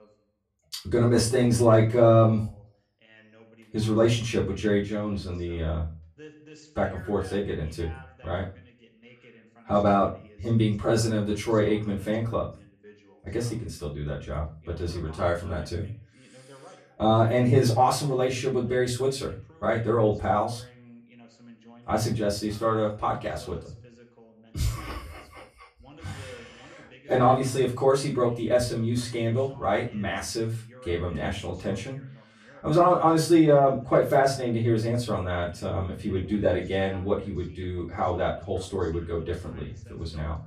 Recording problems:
off-mic speech; far
room echo; slight; dies away in 0.3 s
voice in the background; faint; throughout; 25 dB below the speech

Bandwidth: 13.5 kHz